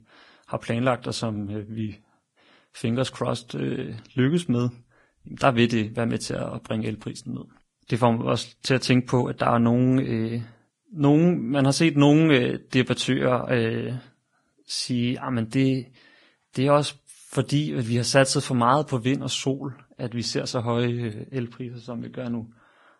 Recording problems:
garbled, watery; badly; nothing above 10.5 kHz

